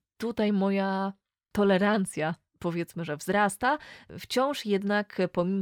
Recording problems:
abrupt cut into speech; at the end

